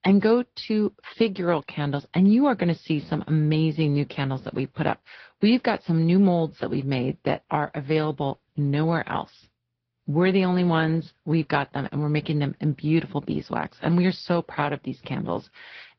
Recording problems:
high frequencies cut off; noticeable; nothing above 5.5 kHz
garbled, watery; slightly

